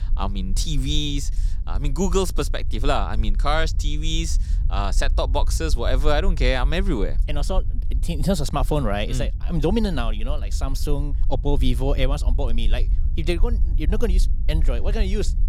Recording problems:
low rumble; noticeable; throughout; 20 dB below the speech

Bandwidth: 19 kHz